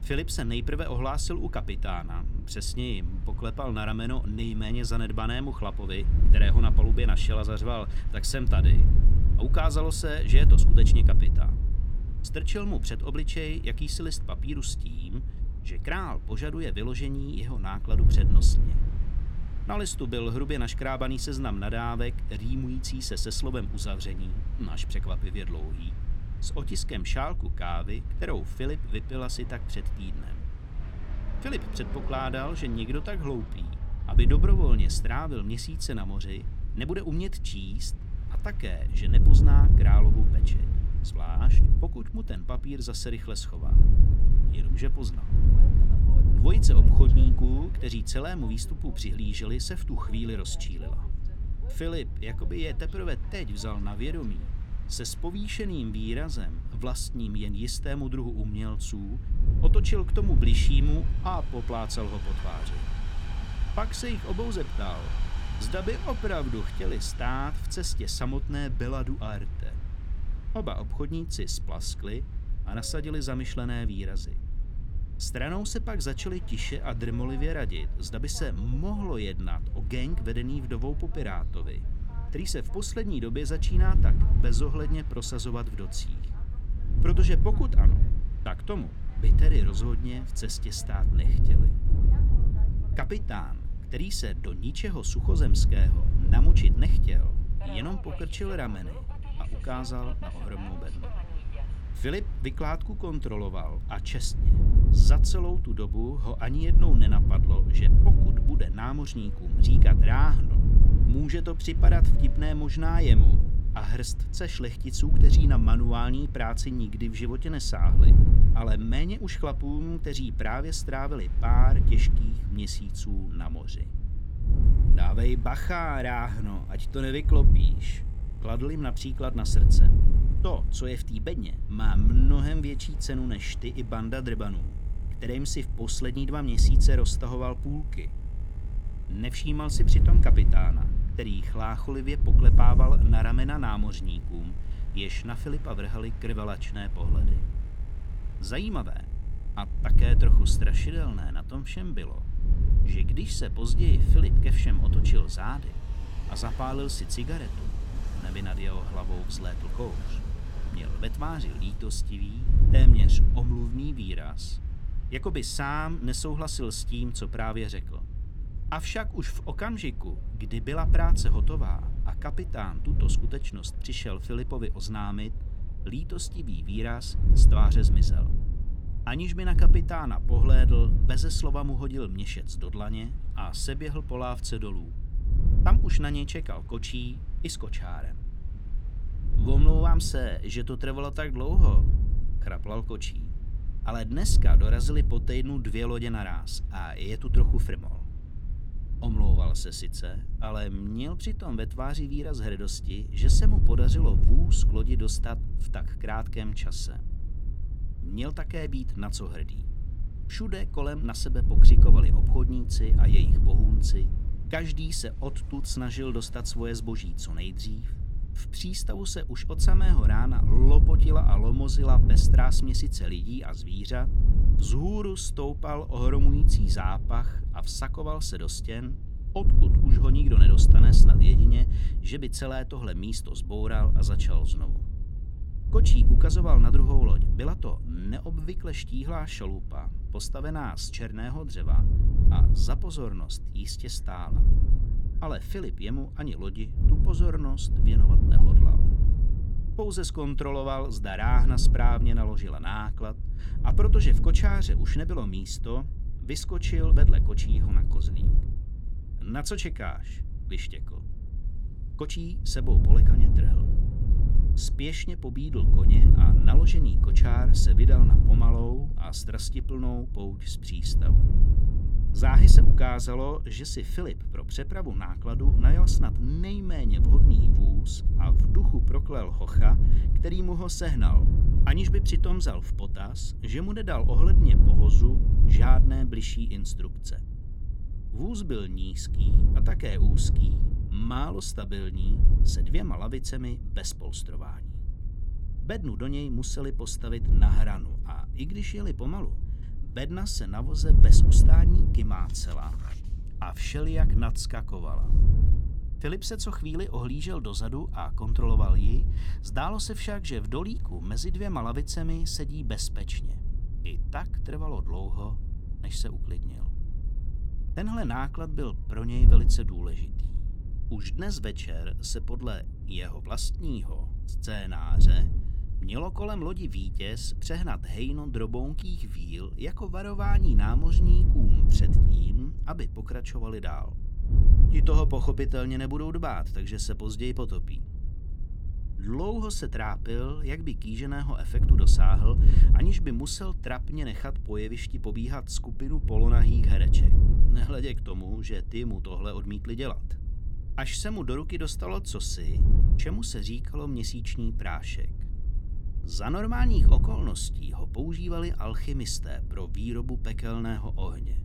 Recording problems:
wind noise on the microphone; heavy; 8 dB below the speech
train or aircraft noise; noticeable; throughout; 20 dB below the speech

